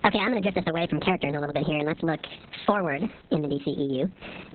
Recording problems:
garbled, watery; badly; nothing above 4 kHz
squashed, flat; heavily
wrong speed and pitch; too fast and too high; 1.5 times normal speed

